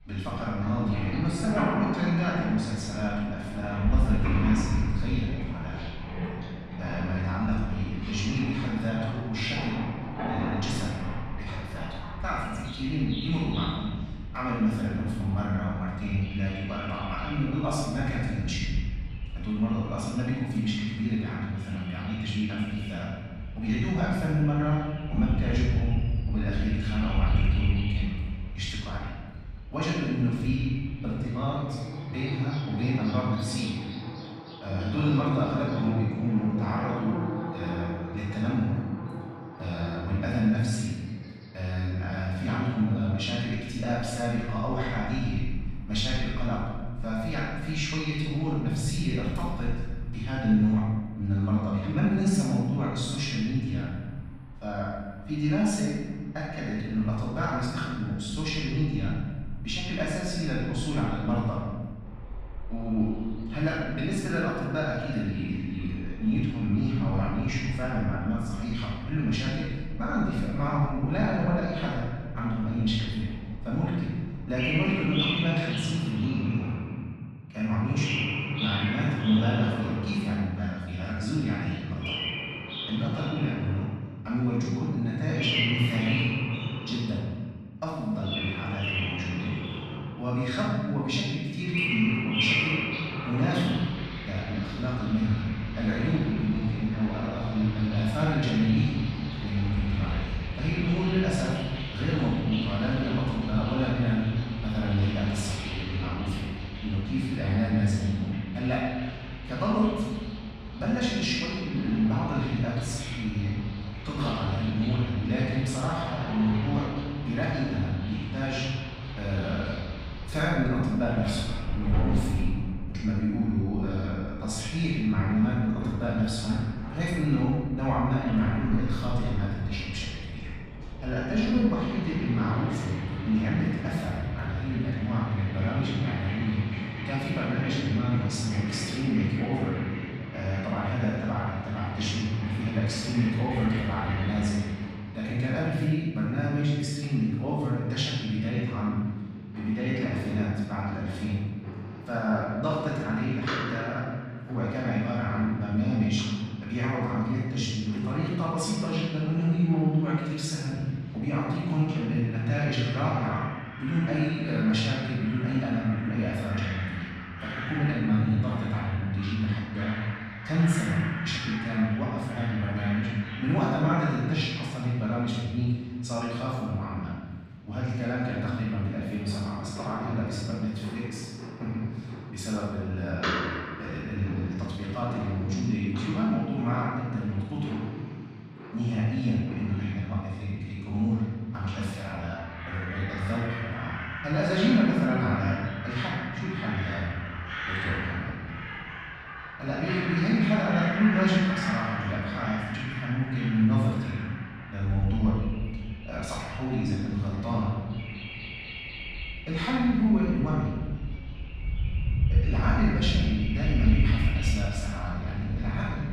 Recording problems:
room echo; strong; dies away in 1.4 s
off-mic speech; far
animal sounds; loud; throughout; 7 dB below the speech

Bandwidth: 15.5 kHz